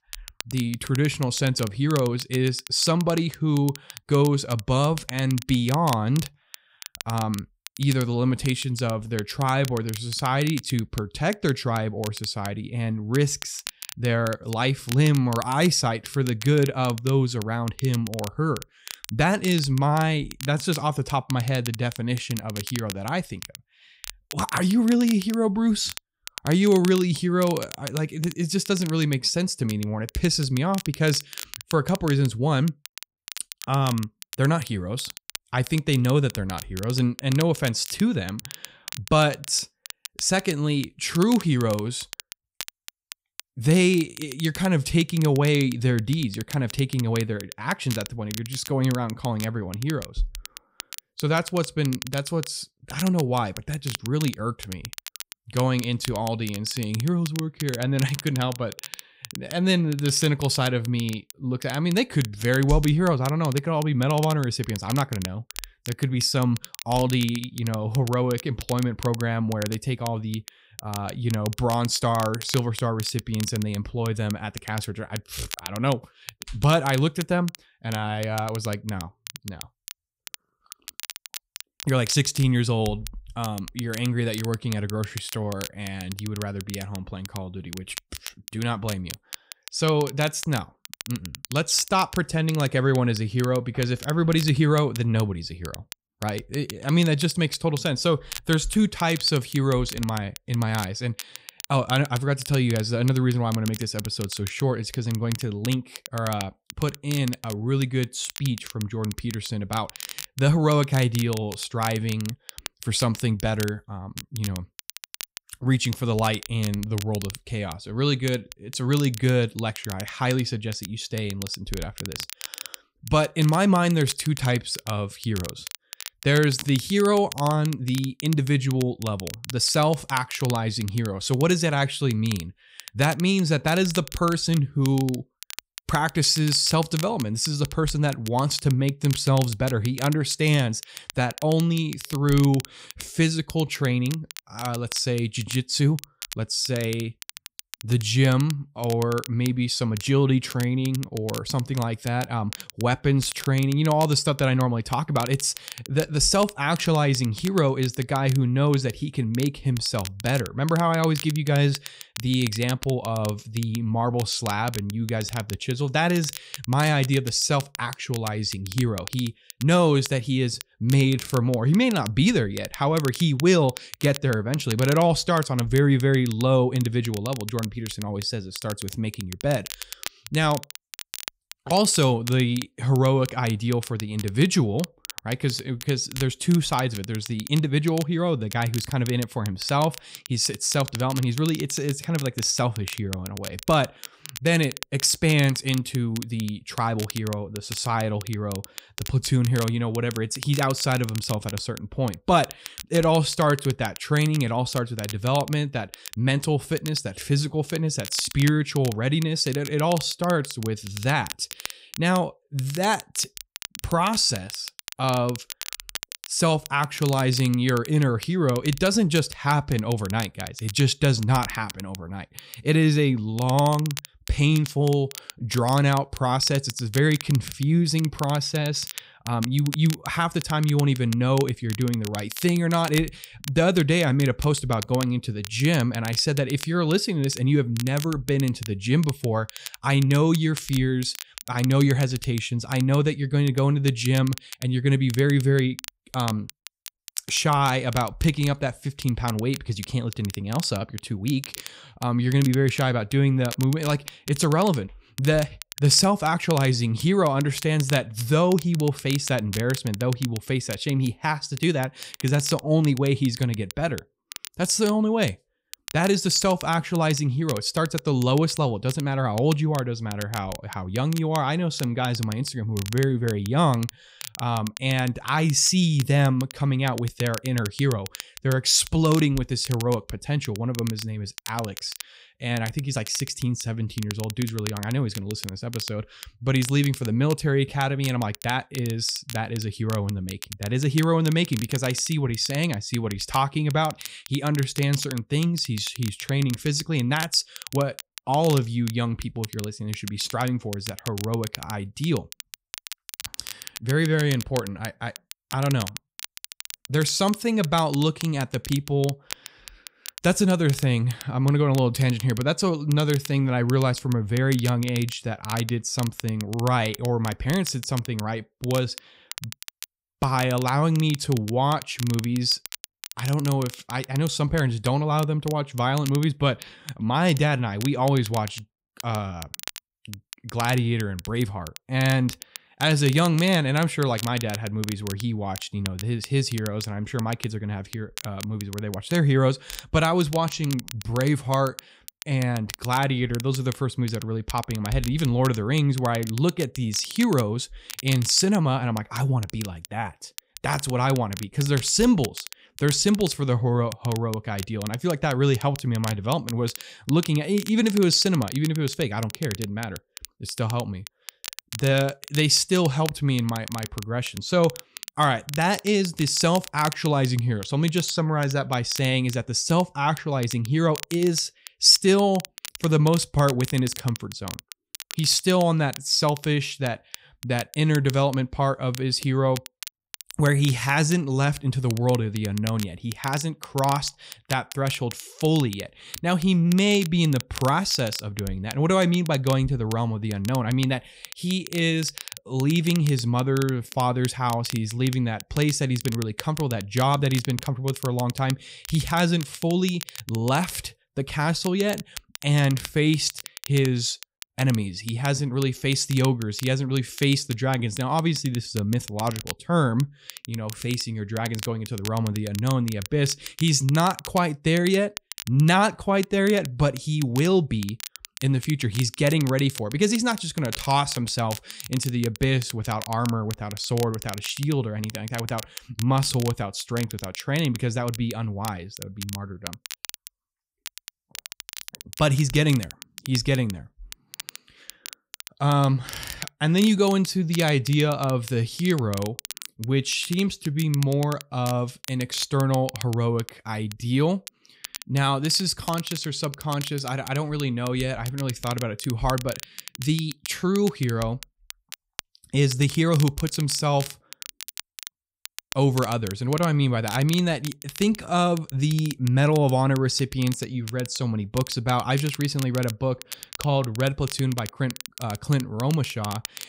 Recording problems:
crackle, like an old record; noticeable; 15 dB below the speech

